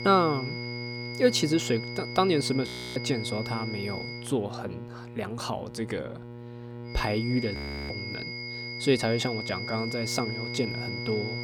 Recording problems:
high-pitched whine; loud; until 4 s and from 7 s on; 2 kHz, 7 dB below the speech
electrical hum; noticeable; throughout; 60 Hz, 15 dB below the speech
audio freezing; at 2.5 s and at 7.5 s

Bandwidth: 17.5 kHz